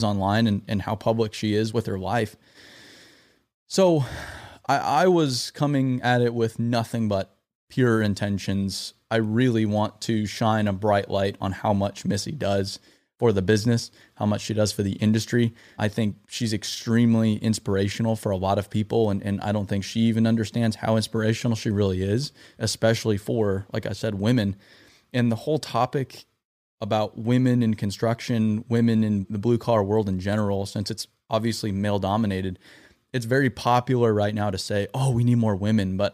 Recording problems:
abrupt cut into speech; at the start

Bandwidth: 15 kHz